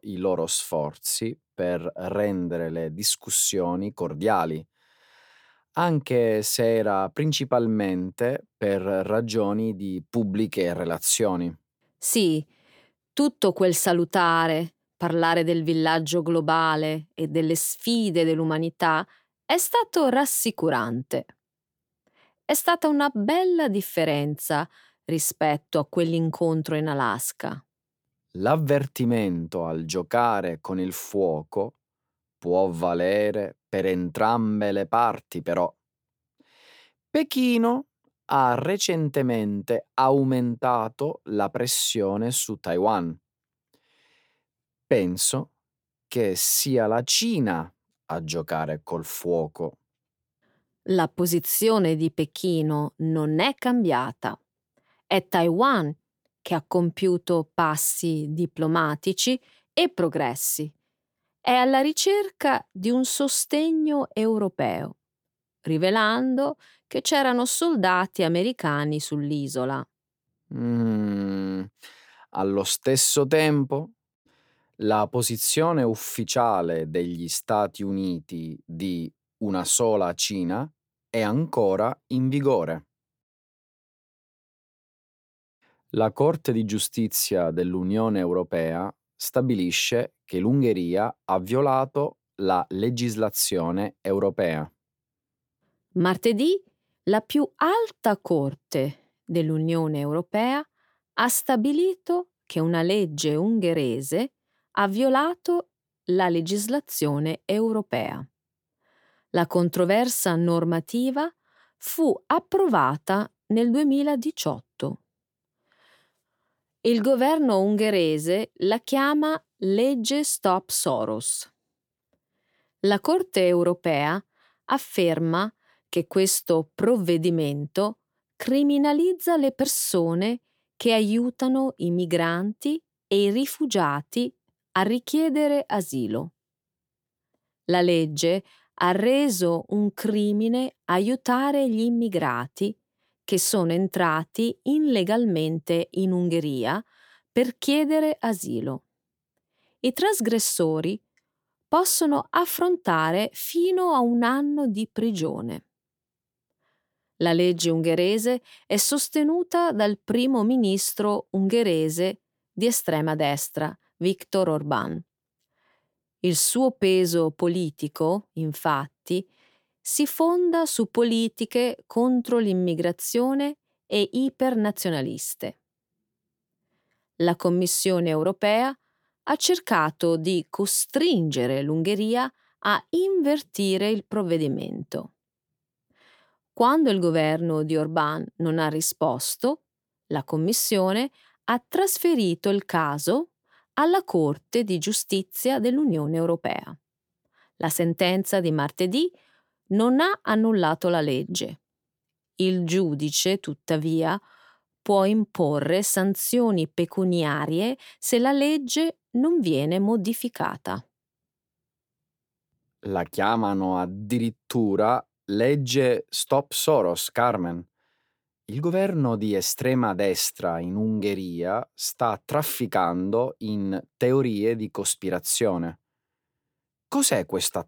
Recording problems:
none

